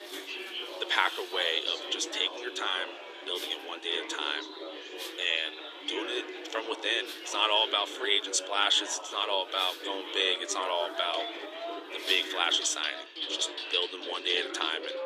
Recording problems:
thin; very; fading below 300 Hz
animal sounds; noticeable; throughout; 15 dB below the speech
household noises; noticeable; throughout; 10 dB below the speech
background chatter; noticeable; throughout; 4 voices, 10 dB below the speech

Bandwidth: 14.5 kHz